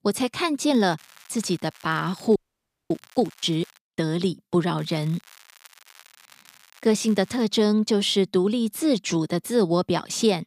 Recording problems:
crackling; faint; at 0.5 s, from 1.5 to 4 s and from 5 to 7.5 s; 25 dB below the speech
audio freezing; at 2.5 s for 0.5 s

